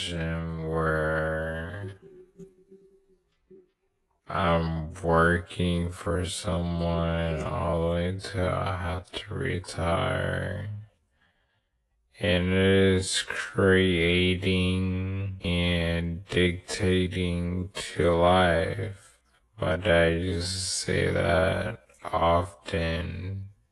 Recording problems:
wrong speed, natural pitch; too slow; 0.5 times normal speed
garbled, watery; slightly
abrupt cut into speech; at the start

